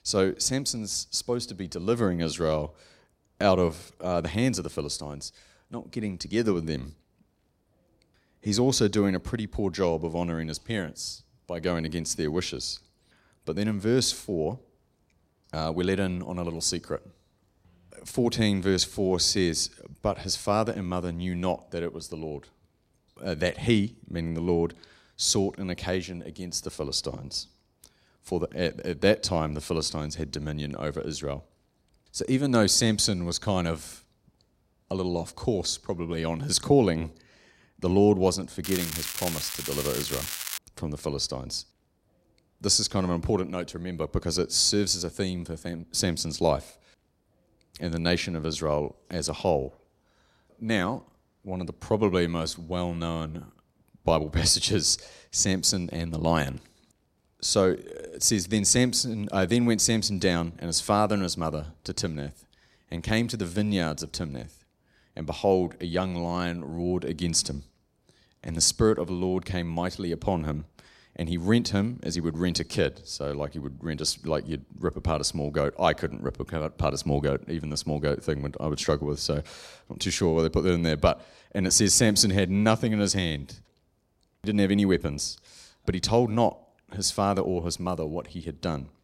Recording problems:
crackling; loud; from 39 to 41 s; 5 dB below the speech

